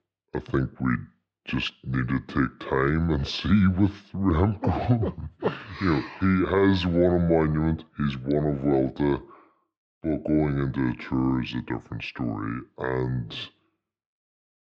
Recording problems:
wrong speed and pitch; too slow and too low; 0.7 times normal speed
muffled; slightly; fading above 3.5 kHz

